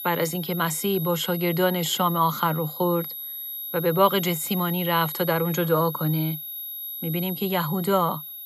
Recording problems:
high-pitched whine; loud; throughout; 11.5 kHz, 7 dB below the speech

